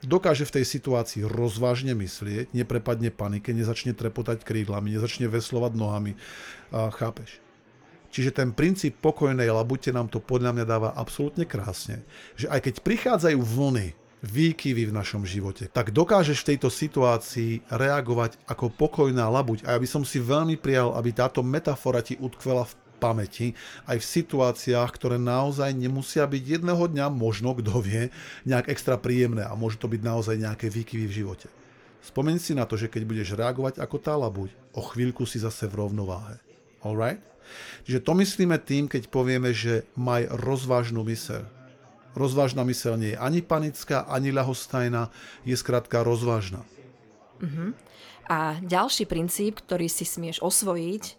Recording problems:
chatter from many people; faint; throughout; 30 dB below the speech

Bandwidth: 18 kHz